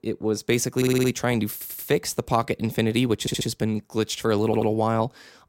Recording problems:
audio stuttering; 4 times, first at 1 s

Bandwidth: 16 kHz